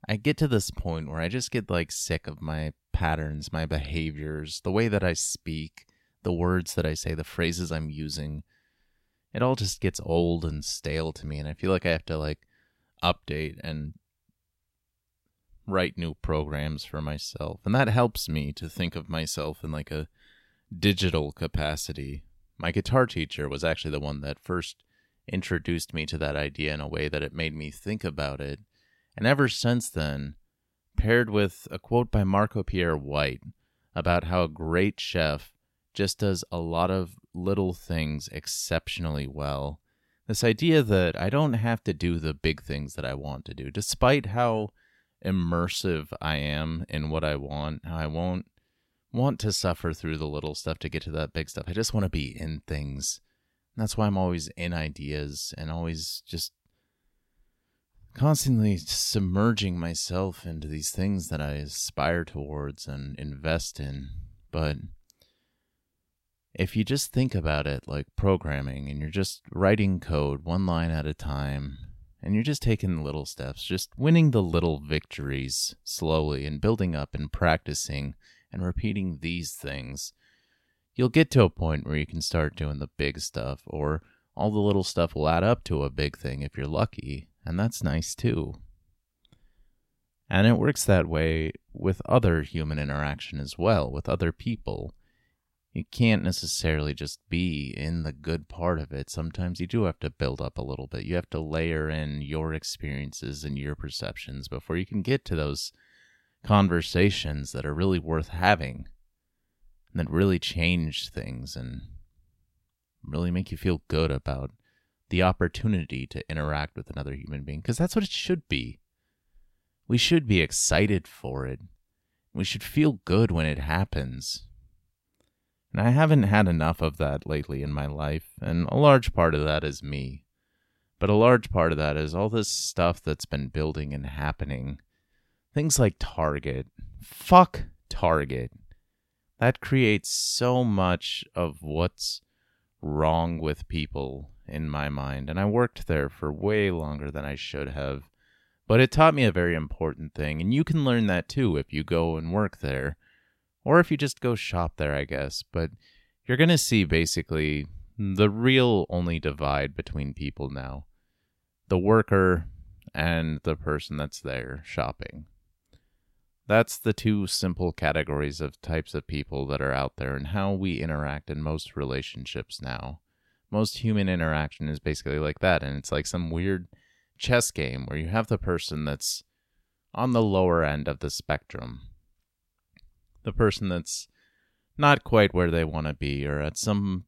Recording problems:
none

